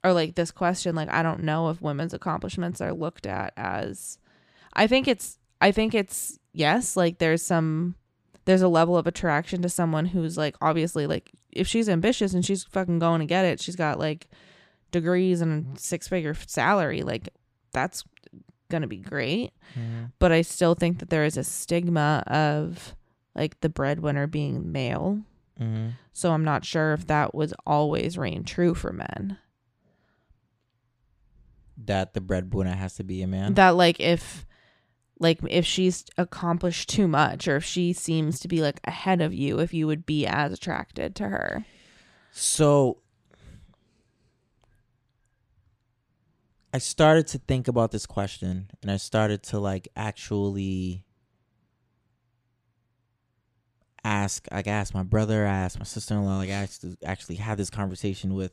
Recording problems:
none

